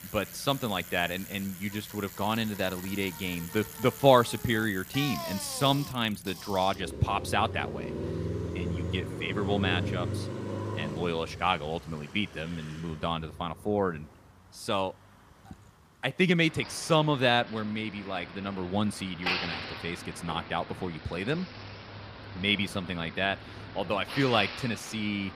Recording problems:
traffic noise; loud; throughout; 9 dB below the speech

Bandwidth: 15 kHz